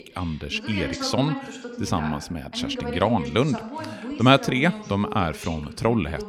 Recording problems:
voice in the background; loud; throughout; 10 dB below the speech

